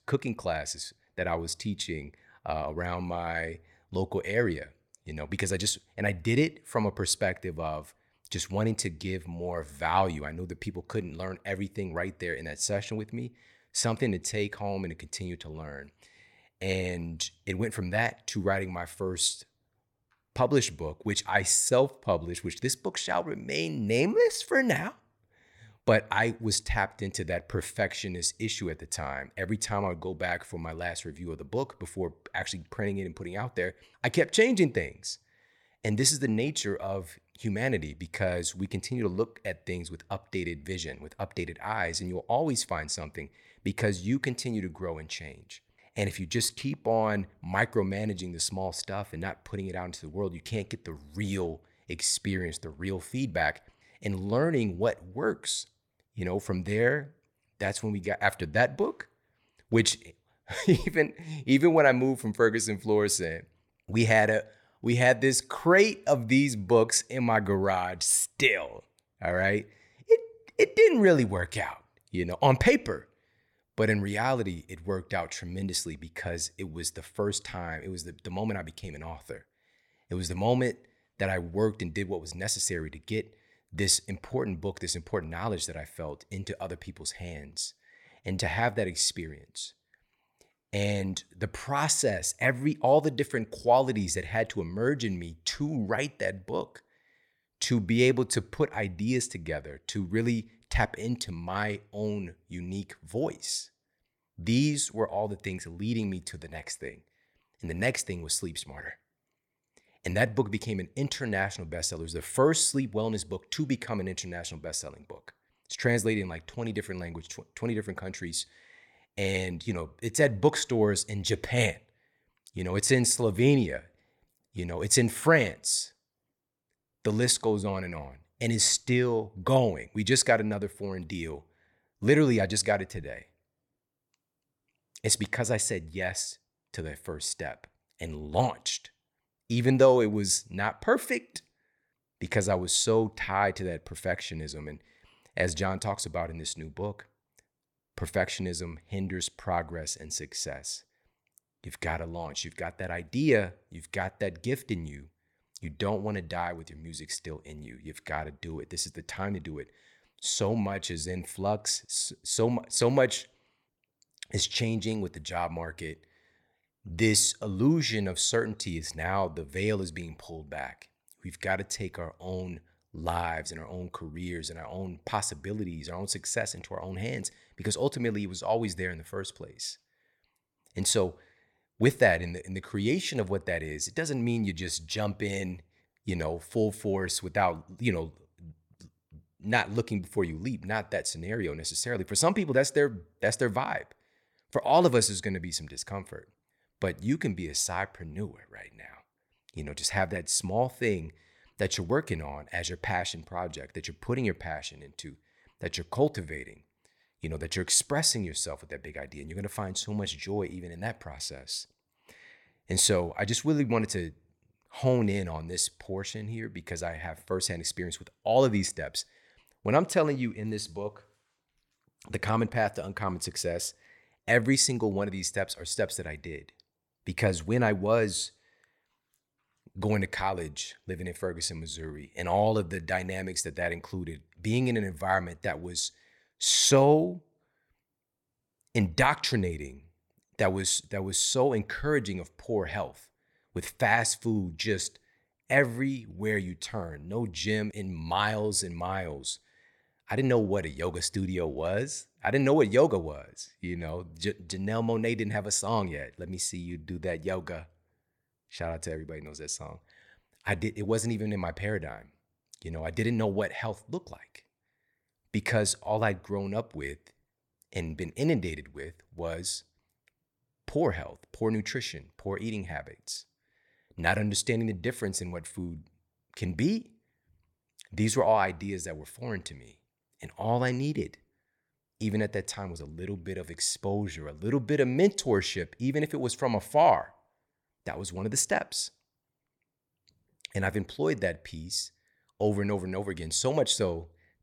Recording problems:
none

